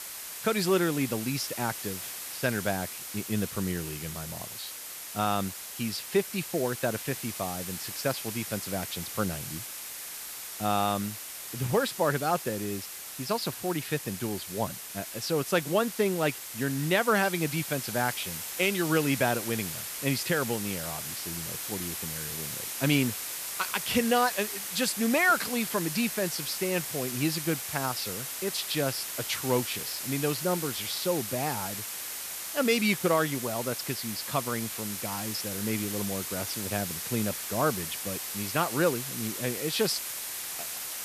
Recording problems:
hiss; loud; throughout; 4 dB below the speech

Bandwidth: 14.5 kHz